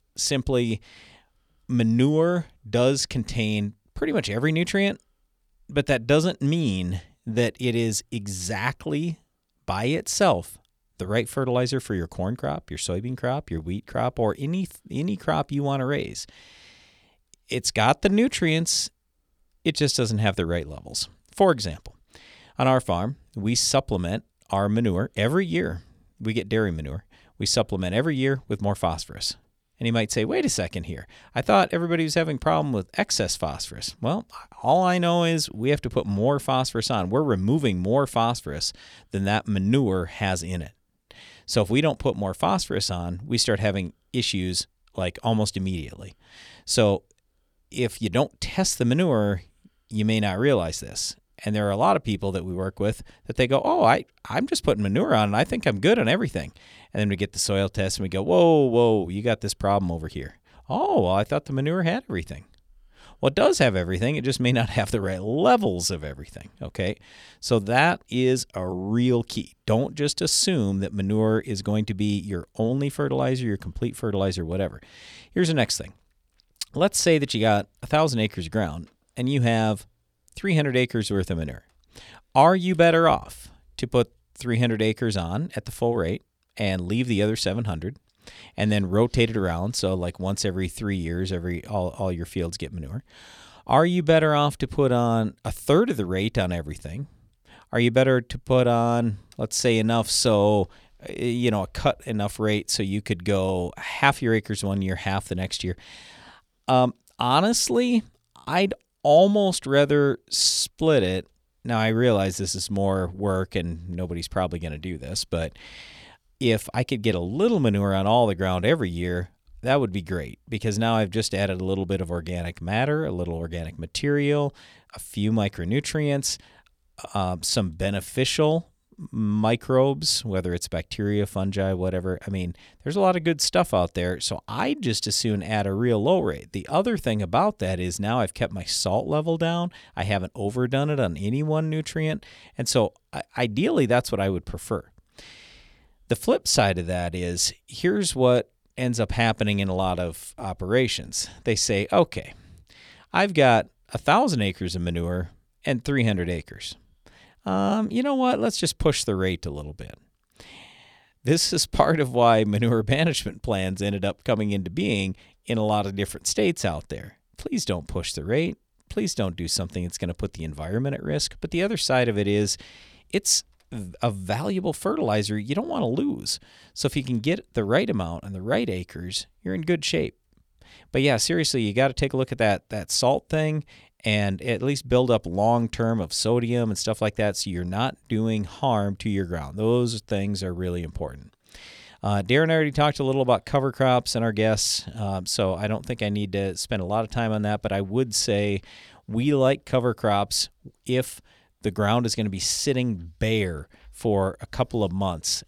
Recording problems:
none

